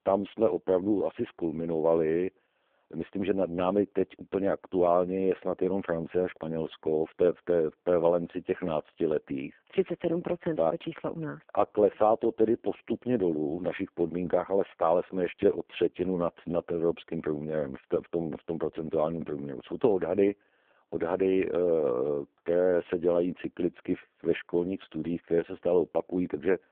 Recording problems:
phone-call audio; poor line

